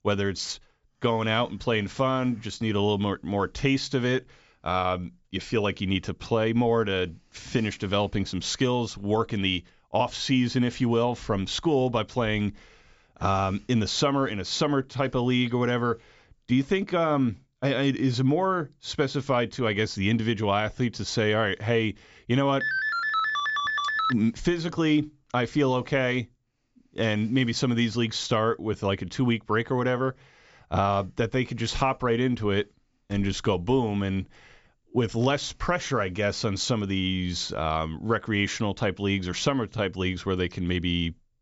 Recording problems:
high frequencies cut off; noticeable; nothing above 8 kHz
phone ringing; loud; from 23 to 24 s; peak 1 dB above the speech

